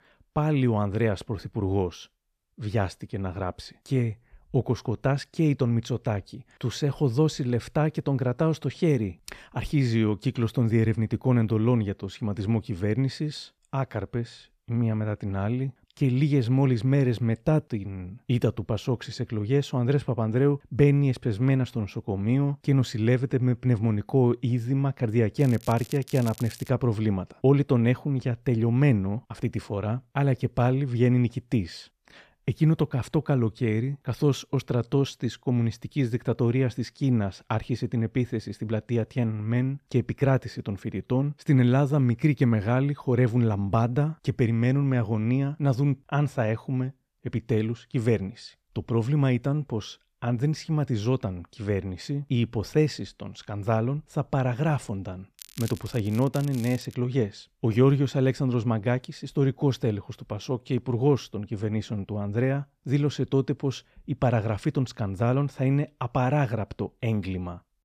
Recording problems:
crackling; noticeable; from 25 to 27 s and from 55 to 57 s; 20 dB below the speech

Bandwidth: 14.5 kHz